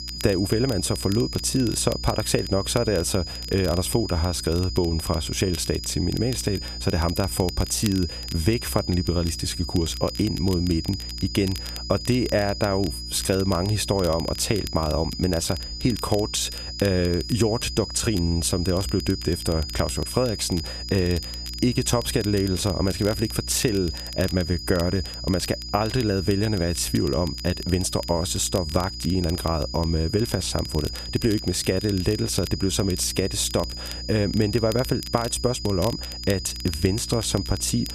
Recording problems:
high-pitched whine; loud; throughout; 5 kHz, 9 dB below the speech
crackle, like an old record; noticeable; 20 dB below the speech
electrical hum; faint; throughout; 60 Hz, 25 dB below the speech

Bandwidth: 14.5 kHz